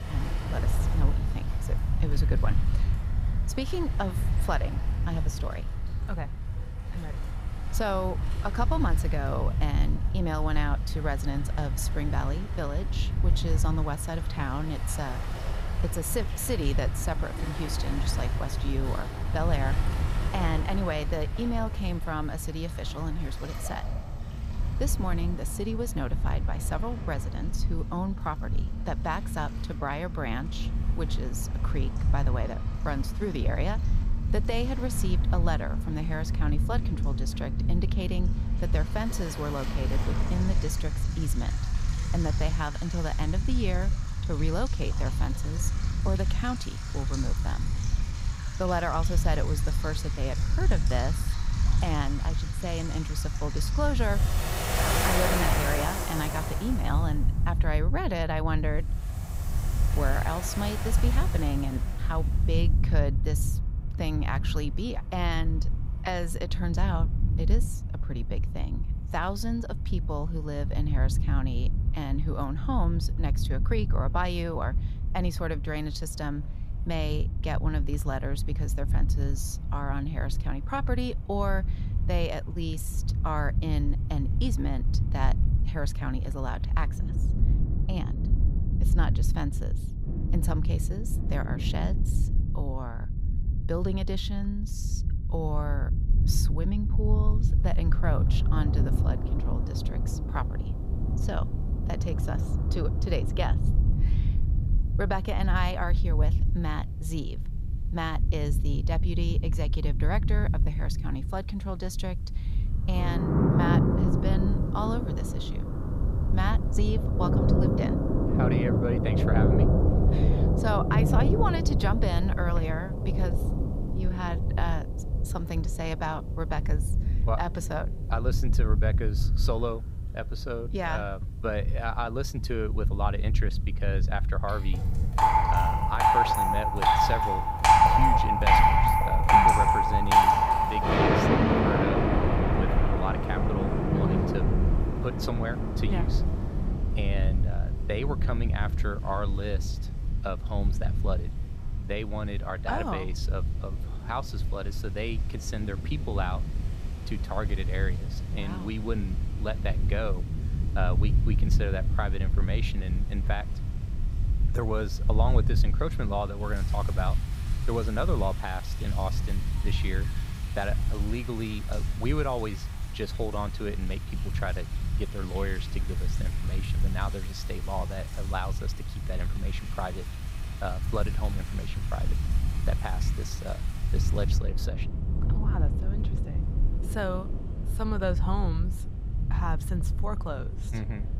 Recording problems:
rain or running water; very loud; throughout; 4 dB above the speech
low rumble; noticeable; throughout; 10 dB below the speech

